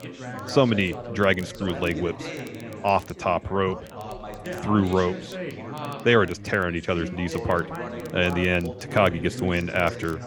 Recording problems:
background chatter; noticeable; throughout; 4 voices, 10 dB below the speech
crackle, like an old record; faint; 30 dB below the speech

